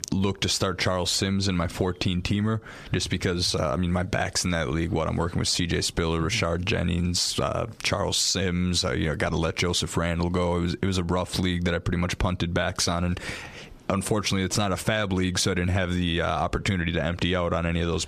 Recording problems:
squashed, flat; somewhat

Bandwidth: 14.5 kHz